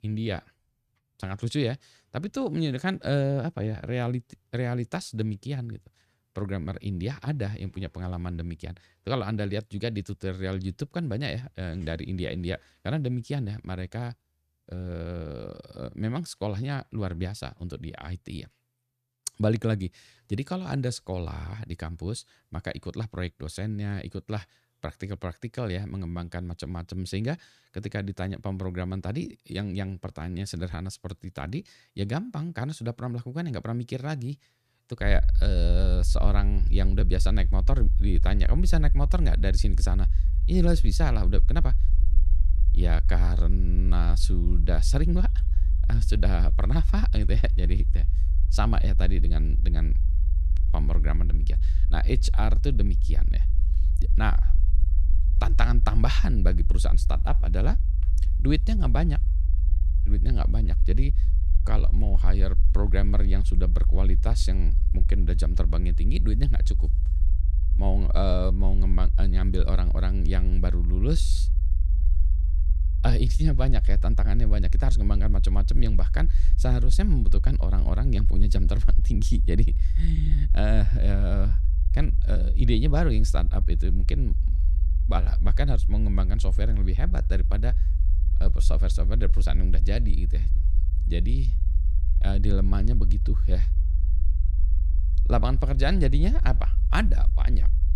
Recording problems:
low rumble; noticeable; from 35 s on; 10 dB below the speech

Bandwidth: 14.5 kHz